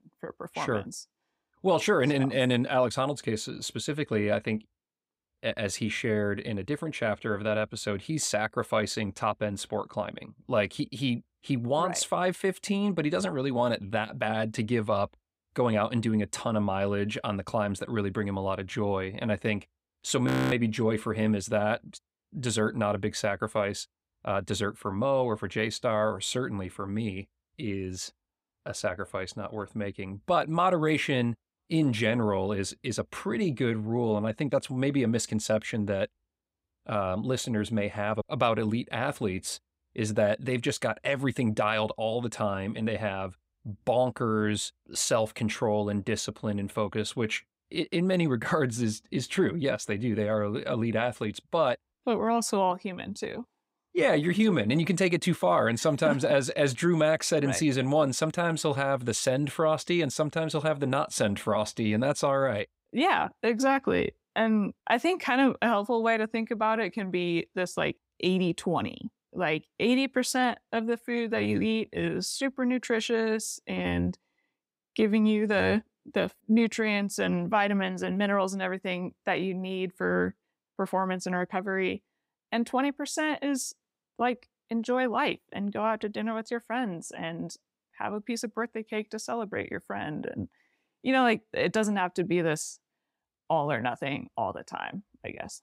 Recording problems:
audio freezing; at 20 s

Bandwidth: 15.5 kHz